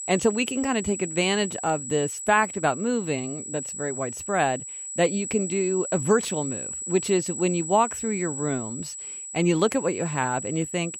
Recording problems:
high-pitched whine; loud; throughout; 8 kHz, 6 dB below the speech

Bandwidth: 16 kHz